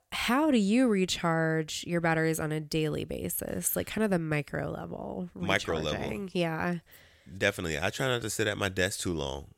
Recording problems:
none

